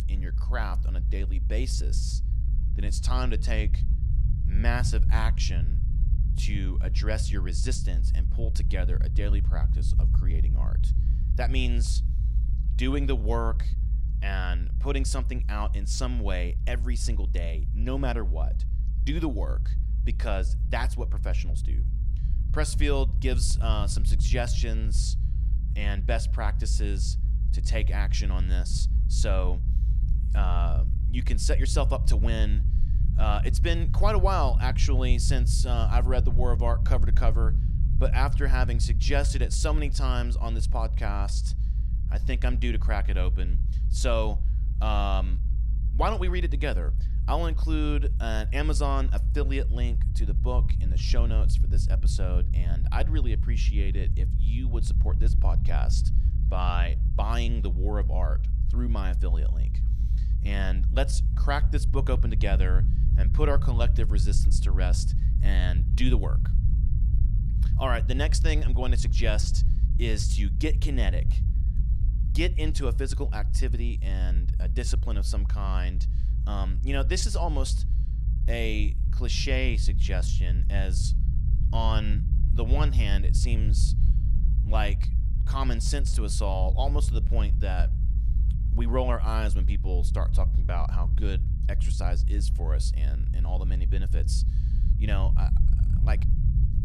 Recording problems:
low rumble; noticeable; throughout; 10 dB below the speech

